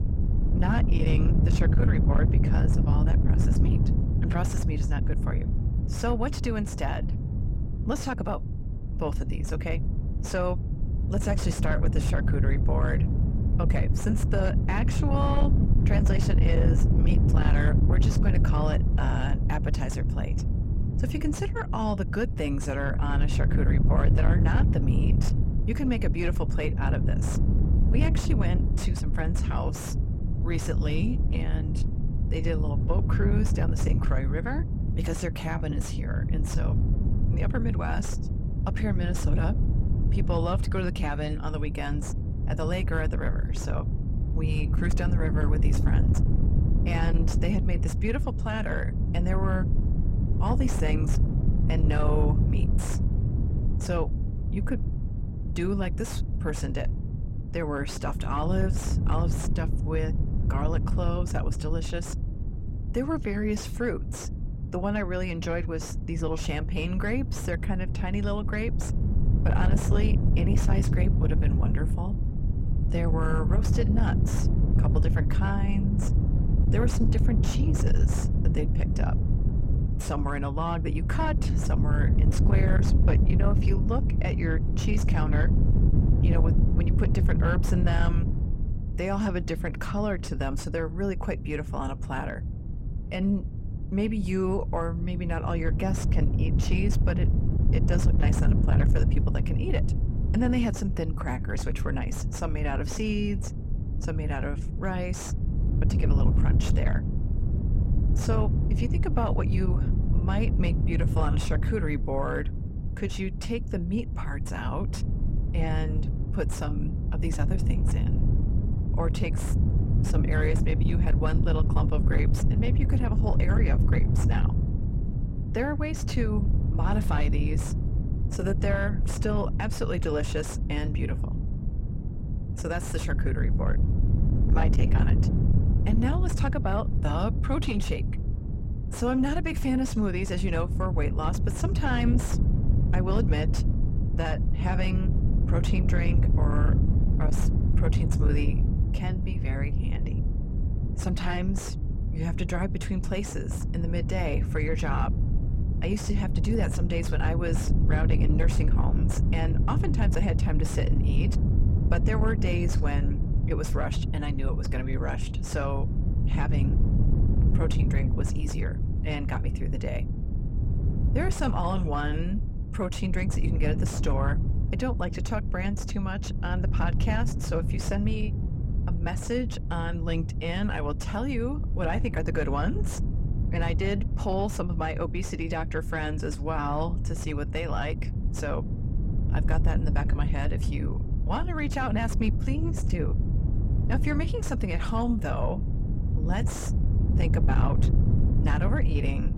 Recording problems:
distortion; slight; 10 dB below the speech
low rumble; loud; throughout; 6 dB below the speech

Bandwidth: 16 kHz